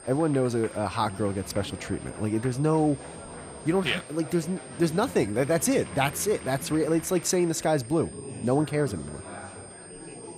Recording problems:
high-pitched whine; noticeable; throughout; 8.5 kHz, 20 dB below the speech
chatter from many people; noticeable; throughout; 15 dB below the speech

